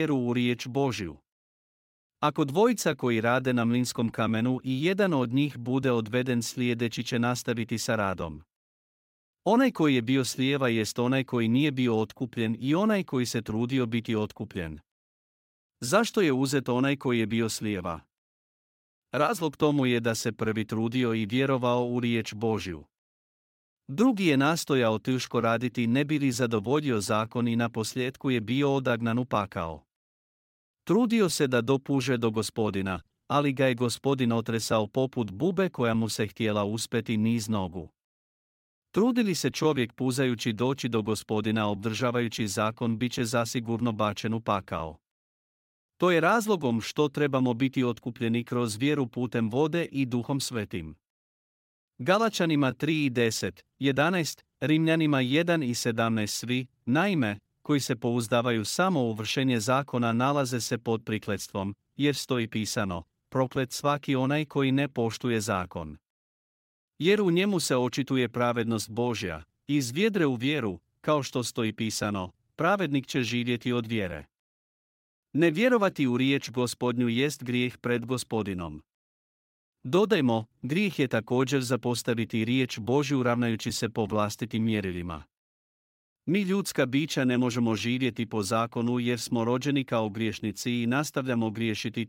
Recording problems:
abrupt cut into speech; at the start

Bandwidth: 16 kHz